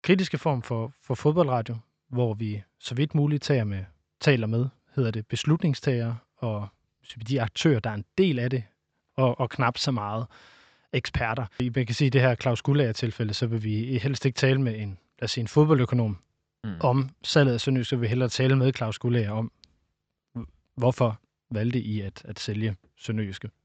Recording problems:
high frequencies cut off; noticeable; nothing above 8 kHz

